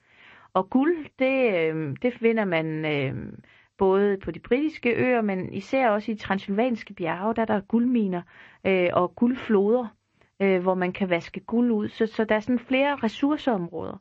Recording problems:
garbled, watery; slightly; nothing above 7.5 kHz
muffled; very slightly; fading above 2.5 kHz

